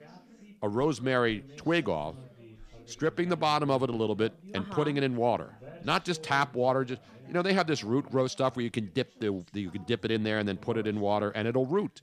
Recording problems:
background chatter; faint; throughout; 4 voices, 20 dB below the speech

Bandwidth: 15 kHz